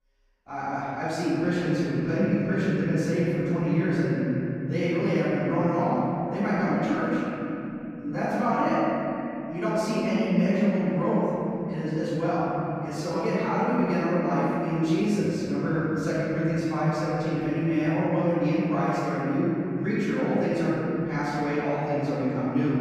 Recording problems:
room echo; strong; dies away in 3 s
off-mic speech; far

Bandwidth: 15 kHz